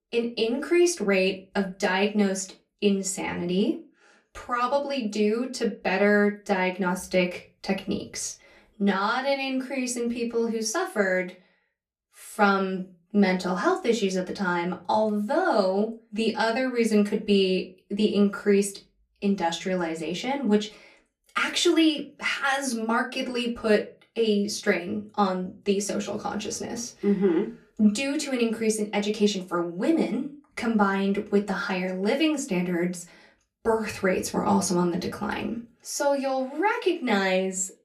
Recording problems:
off-mic speech; far
room echo; very slight; dies away in 0.2 s

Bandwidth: 15 kHz